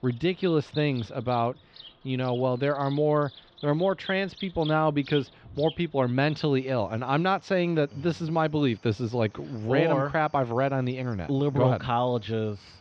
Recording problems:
muffled; slightly; fading above 4 kHz
animal sounds; noticeable; throughout; 20 dB below the speech

